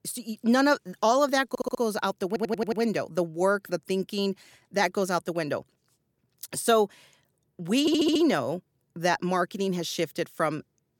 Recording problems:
audio stuttering; at 1.5 s, at 2.5 s and at 8 s

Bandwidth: 17.5 kHz